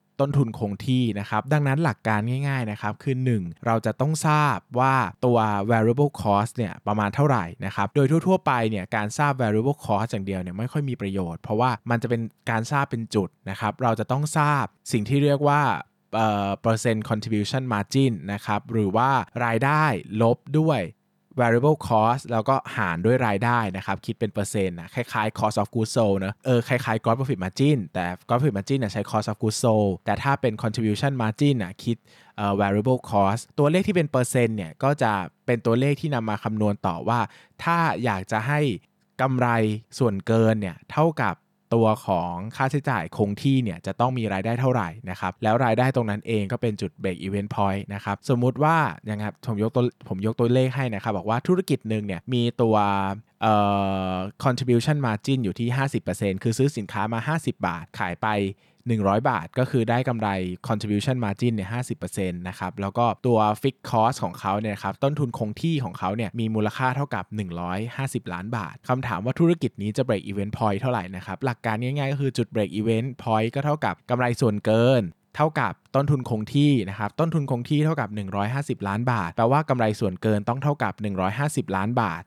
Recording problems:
none

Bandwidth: 18.5 kHz